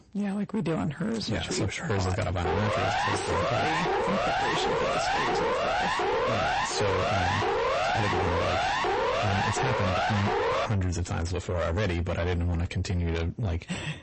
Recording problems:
distortion; heavy; 6 dB below the speech
garbled, watery; slightly; nothing above 8 kHz
siren; loud; from 2.5 to 11 s; peak 4 dB above the speech

